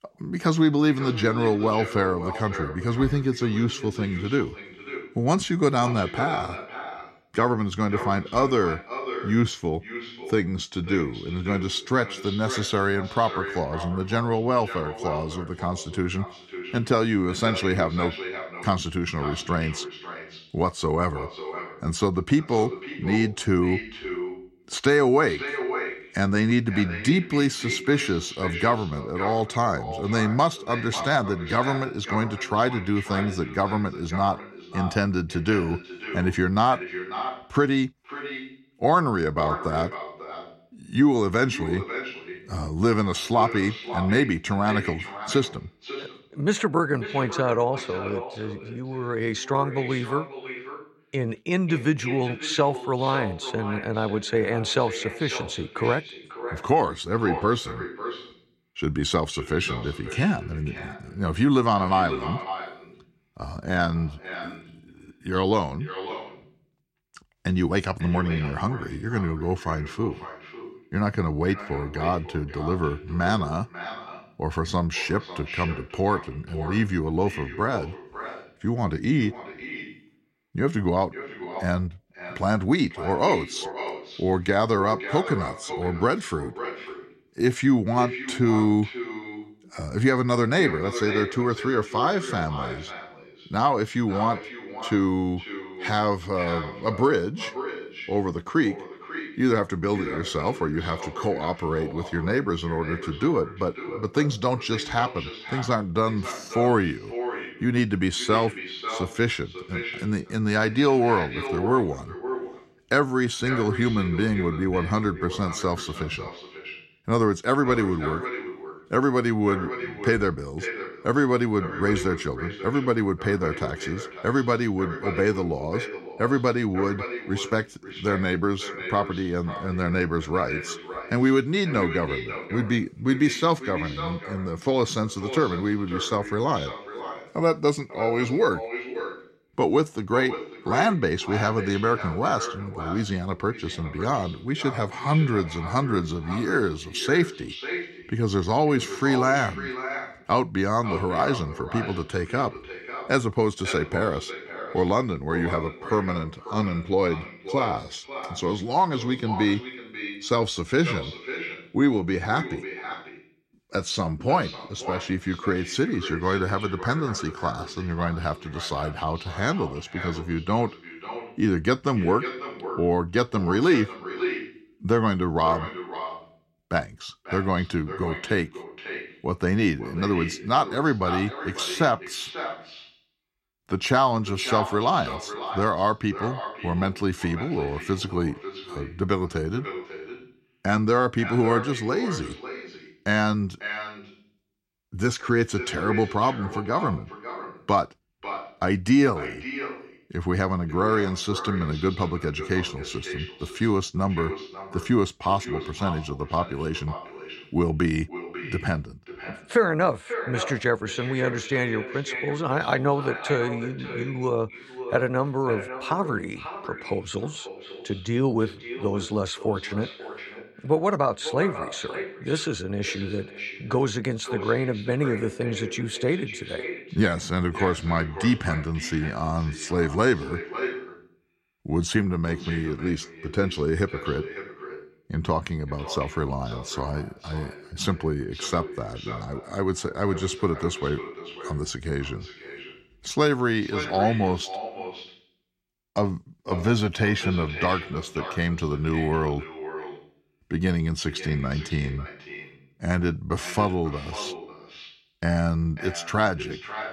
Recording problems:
echo of what is said; strong; throughout; 540 ms later, 10 dB below the speech

